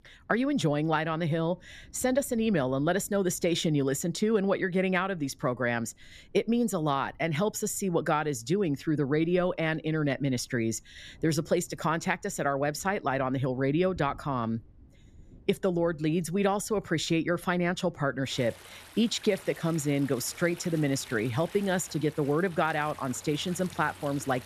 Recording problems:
rain or running water; faint; throughout; 25 dB below the speech

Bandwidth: 14.5 kHz